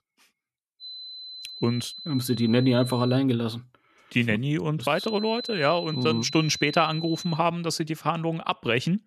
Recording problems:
high-pitched whine; noticeable; from 1 to 3 s and from 5 to 7.5 s; 4 kHz, 10 dB below the speech

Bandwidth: 13.5 kHz